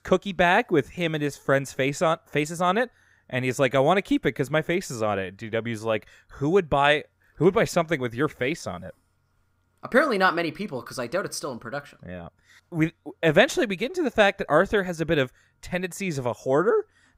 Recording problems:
none

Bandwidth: 15.5 kHz